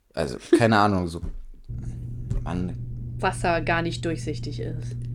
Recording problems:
low rumble; faint; from 1.5 s on; 25 dB below the speech

